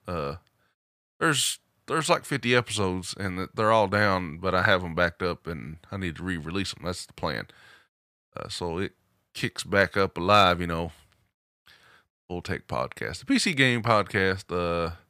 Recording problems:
none

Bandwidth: 15 kHz